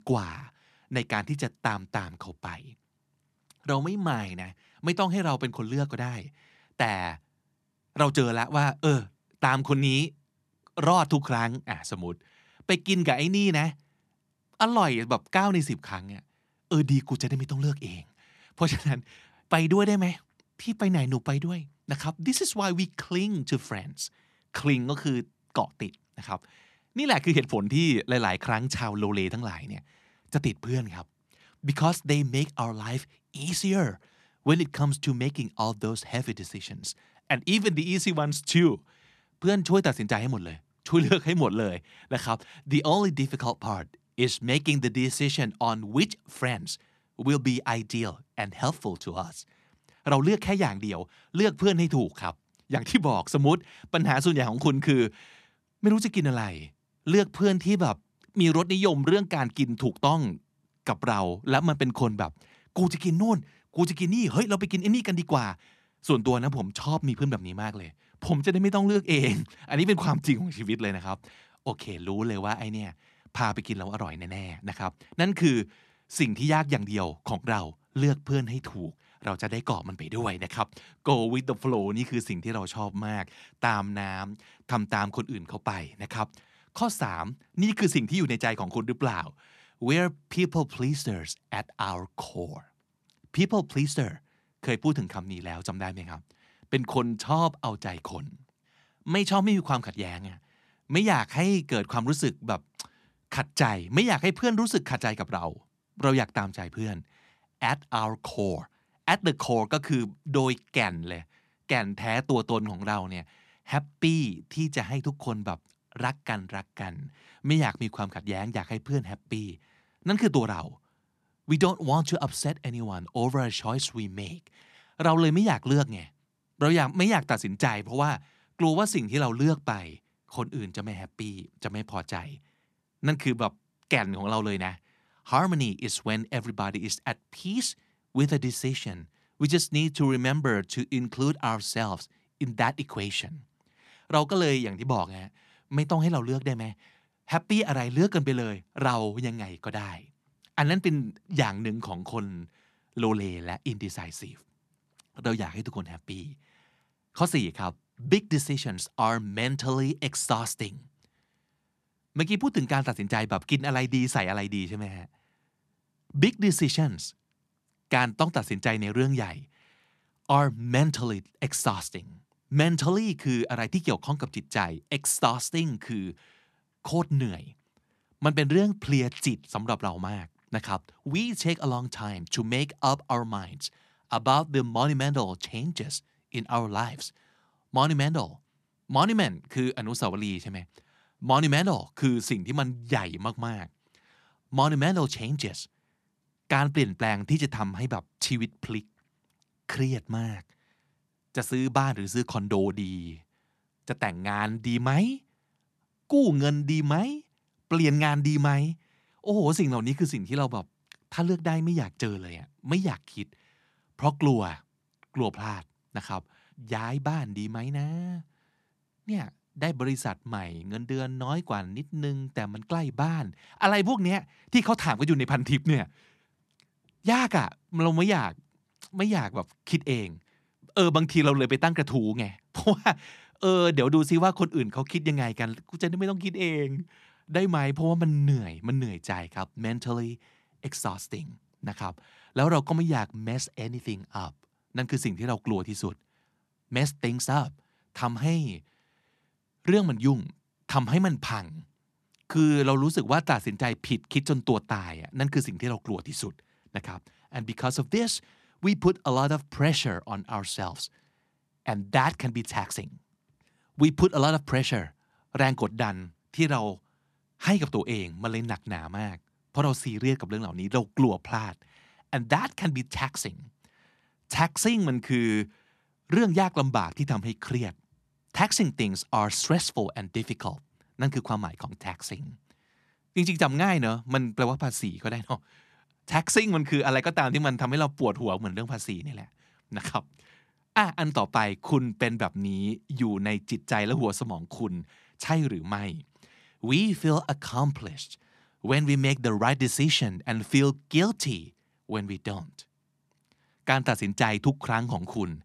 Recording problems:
none

